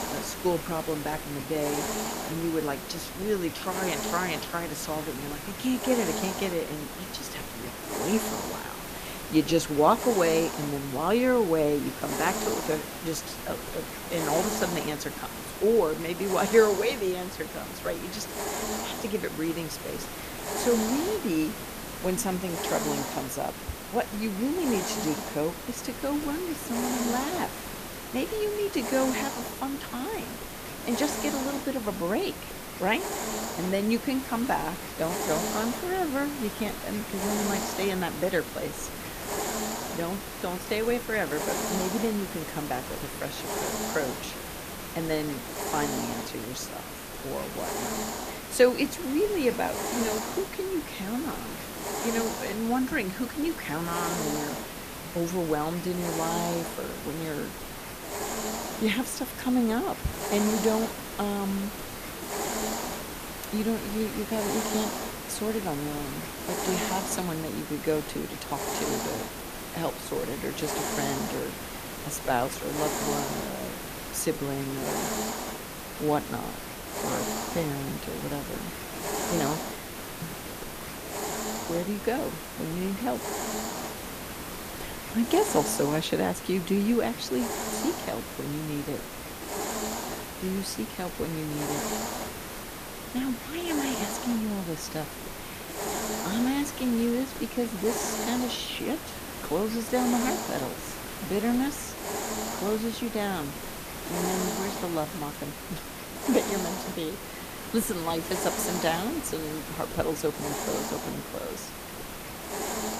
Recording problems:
hiss; loud; throughout; 4 dB below the speech

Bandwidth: 14.5 kHz